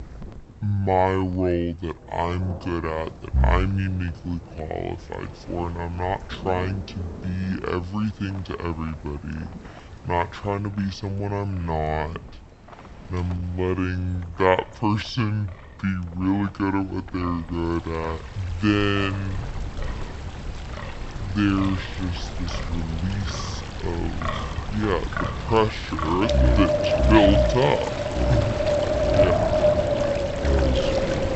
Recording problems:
wrong speed and pitch; too slow and too low; 0.6 times normal speed
high frequencies cut off; noticeable; nothing above 8 kHz
wind in the background; loud; throughout; 1 dB below the speech
rain or running water; noticeable; throughout; 15 dB below the speech
wind noise on the microphone; occasional gusts; from 4 to 21 s; 20 dB below the speech

